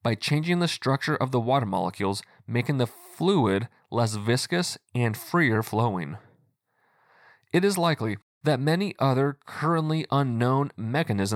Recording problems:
abrupt cut into speech; at the end

